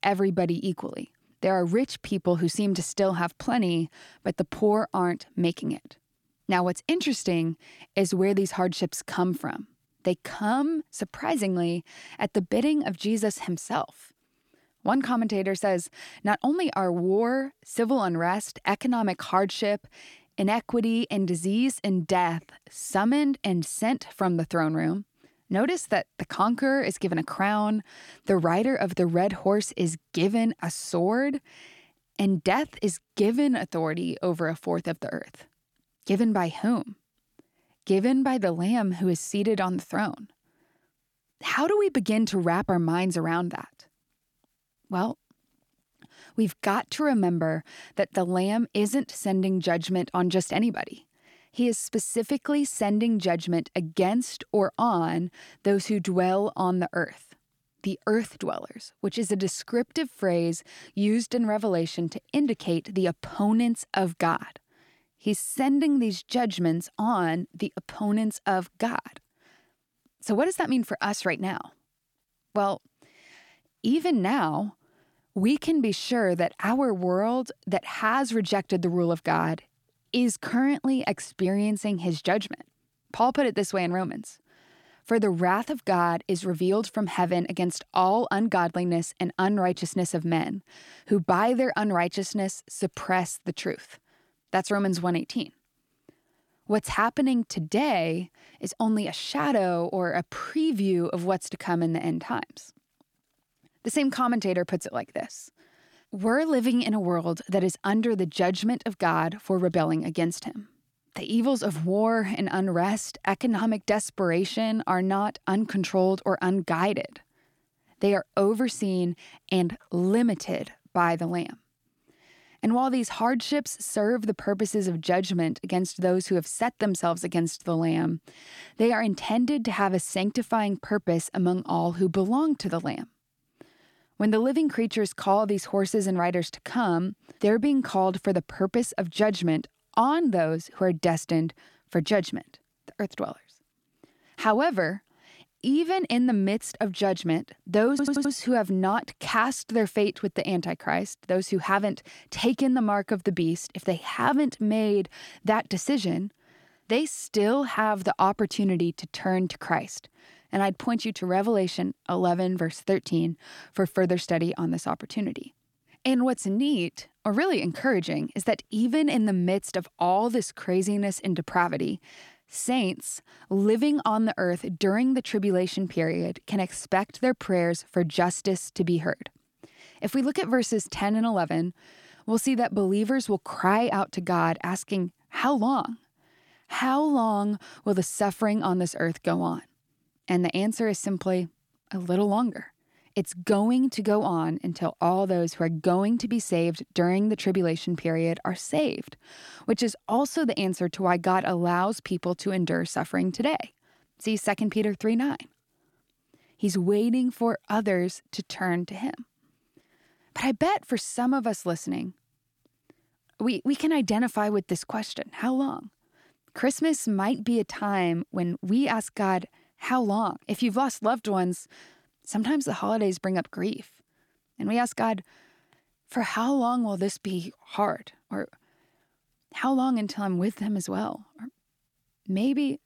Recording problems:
audio stuttering; at 2:28

